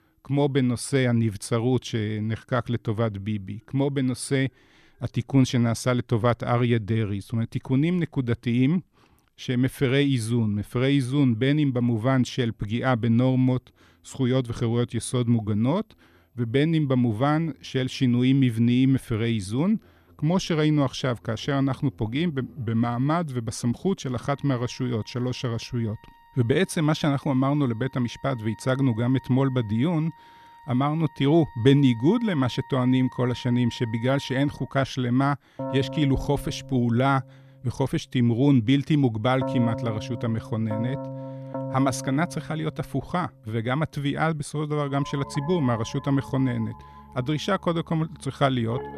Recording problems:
background music; noticeable; throughout; 15 dB below the speech

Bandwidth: 14.5 kHz